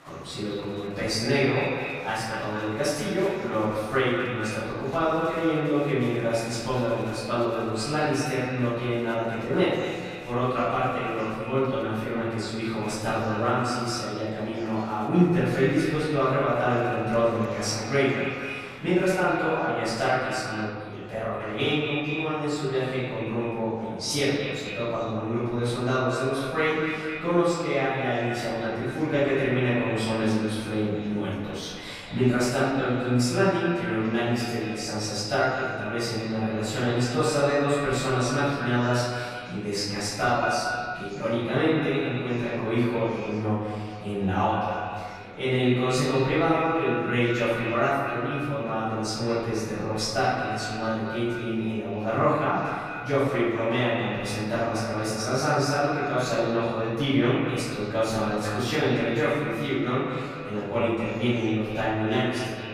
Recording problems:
echo of what is said; strong; throughout; 220 ms later, 8 dB below the speech
room echo; strong; dies away in 1.3 s
off-mic speech; far
murmuring crowd; faint; throughout; 20 dB below the speech

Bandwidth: 15 kHz